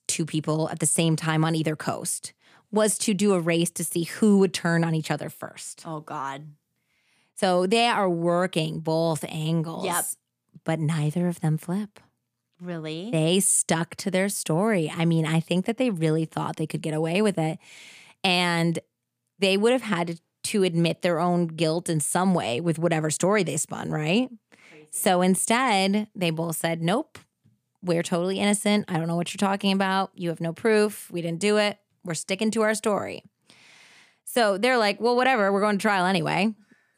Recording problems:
none

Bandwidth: 15 kHz